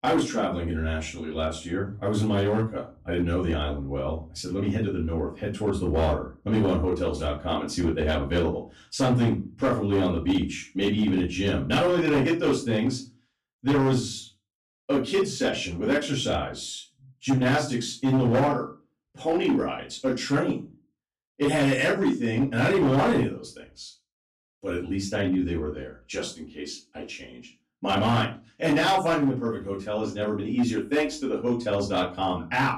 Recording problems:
off-mic speech; far
room echo; slight; dies away in 0.3 s
distortion; slight; 6% of the sound clipped

